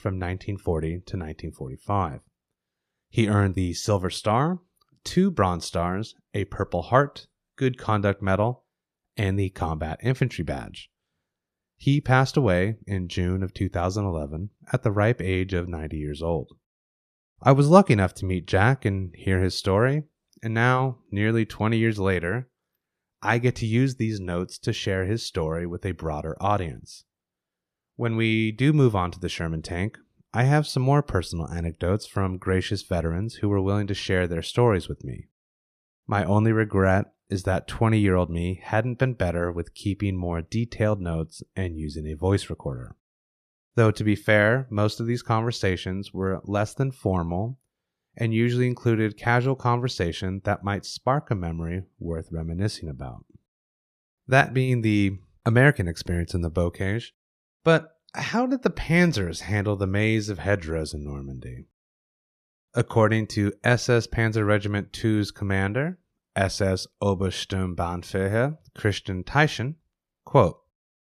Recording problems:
none

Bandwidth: 14 kHz